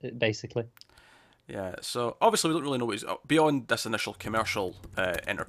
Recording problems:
household noises; noticeable; from 4 s on; 20 dB below the speech

